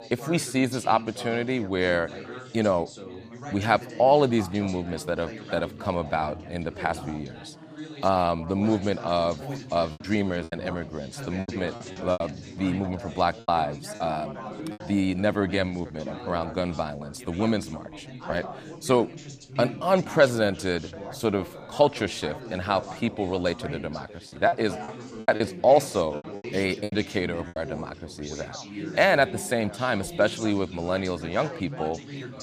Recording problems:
background chatter; noticeable; throughout; 4 voices, 15 dB below the speech
choppy; very; from 10 to 12 s, at 13 s and from 24 to 28 s; 11% of the speech affected

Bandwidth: 15 kHz